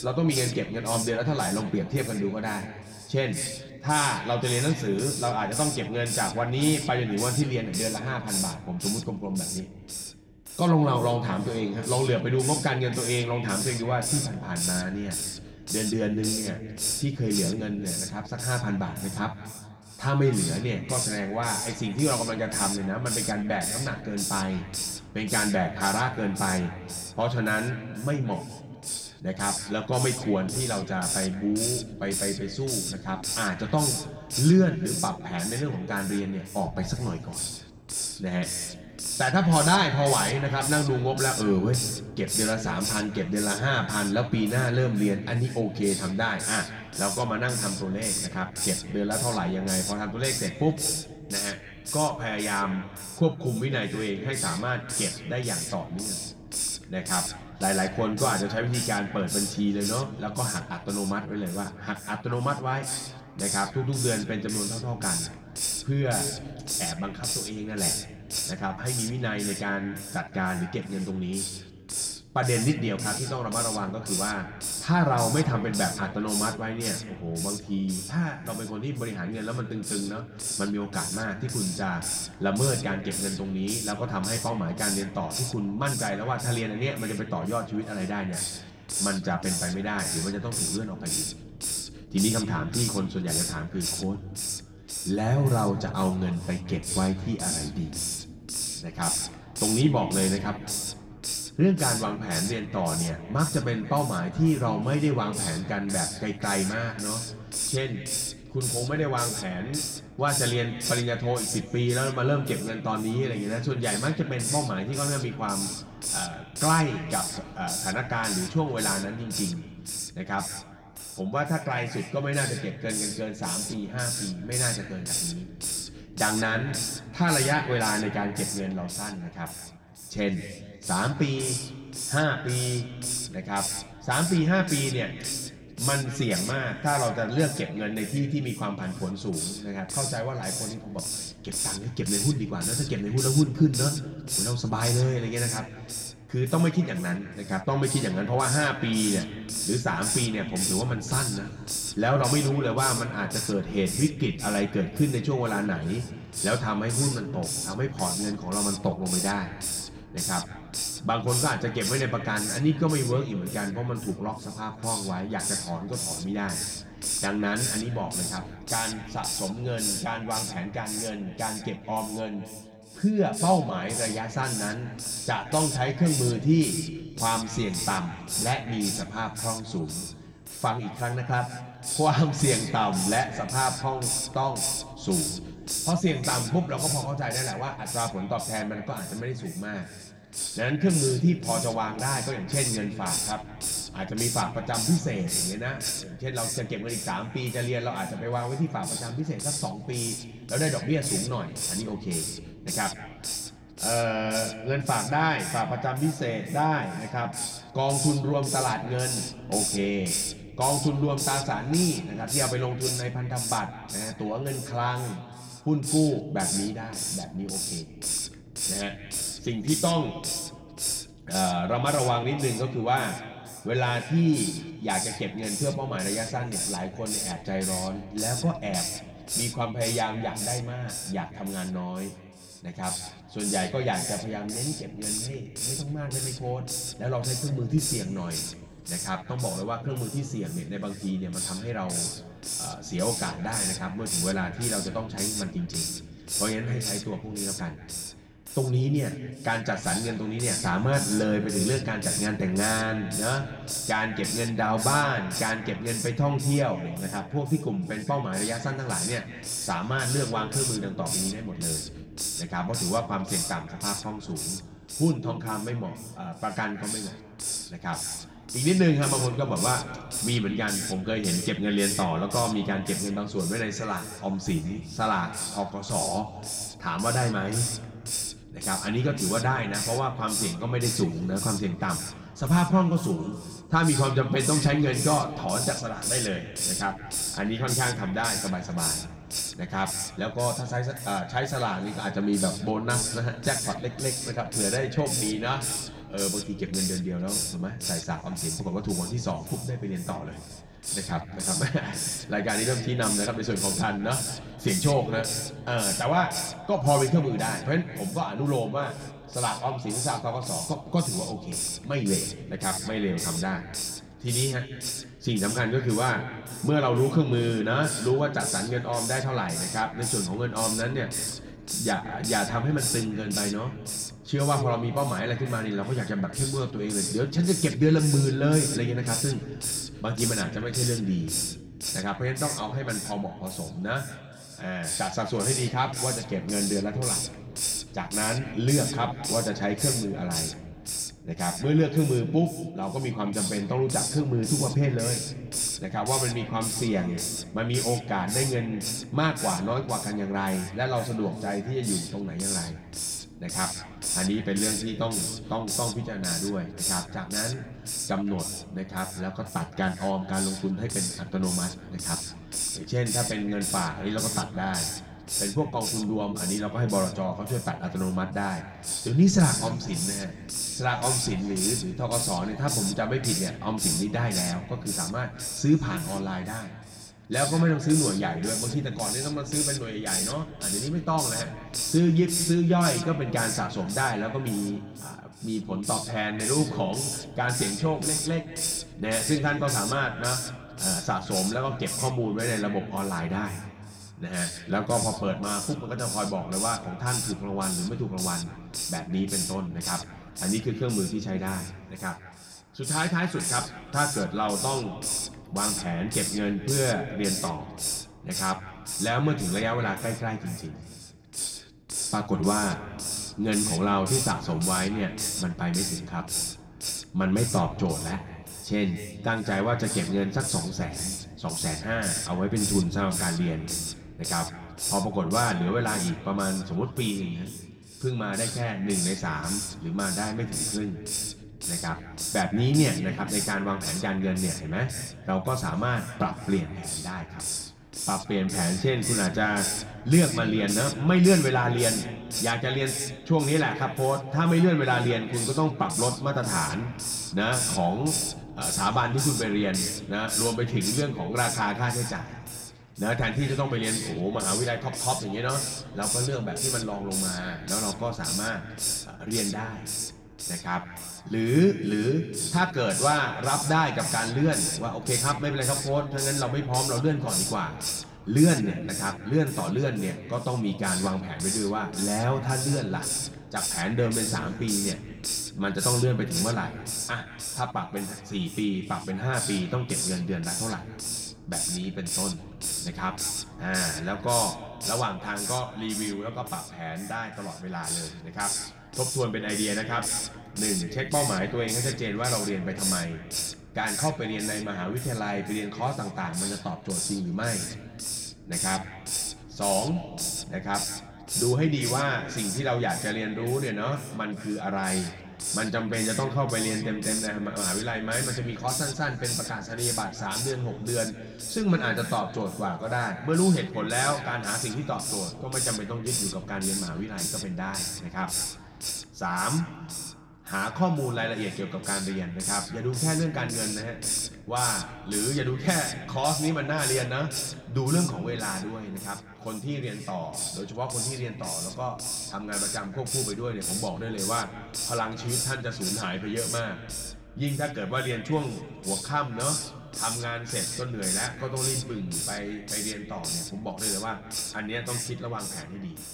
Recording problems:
room echo; slight; dies away in 2 s
off-mic speech; somewhat distant
hiss; loud; throughout; 3 dB below the speech

